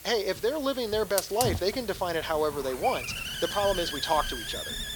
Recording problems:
thin; somewhat; fading below 400 Hz
hiss; loud; throughout; 6 dB below the speech

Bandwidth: 18.5 kHz